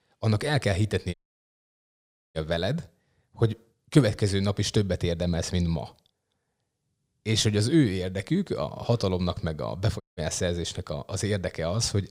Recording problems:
audio cutting out; at 1 s for 1 s and at 10 s

